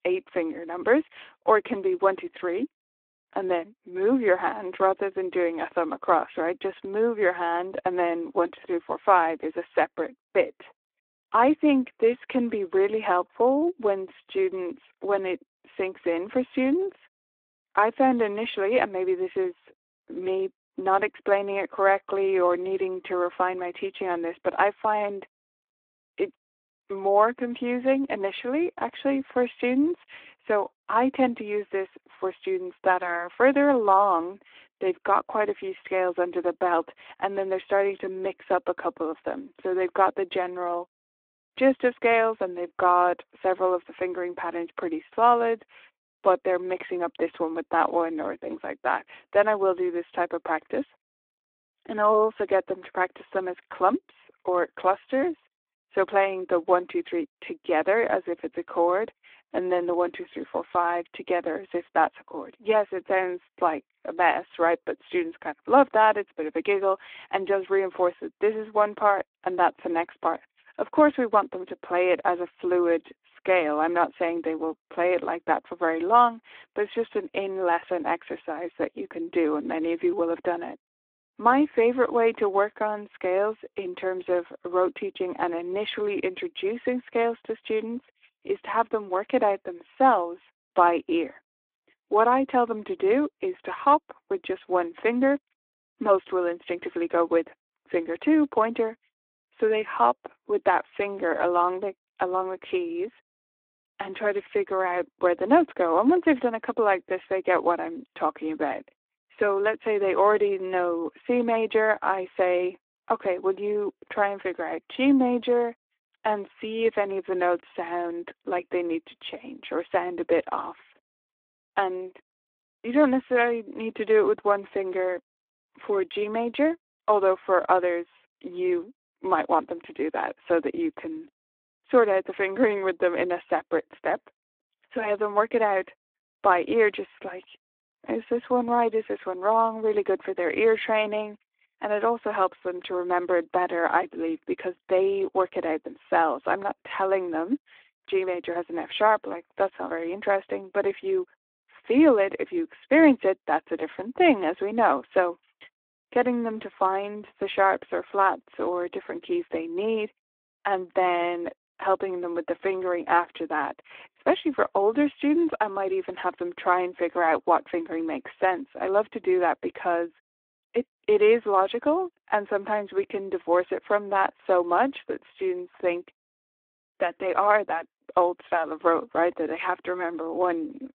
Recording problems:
phone-call audio; nothing above 3.5 kHz

